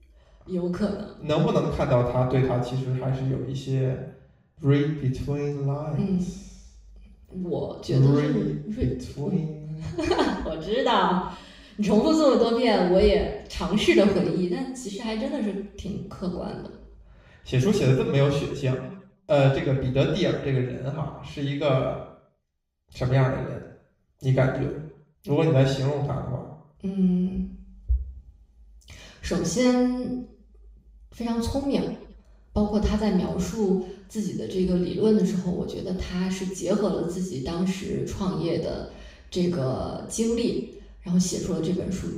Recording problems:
off-mic speech; far
room echo; noticeable; dies away in 0.6 s

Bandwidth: 15.5 kHz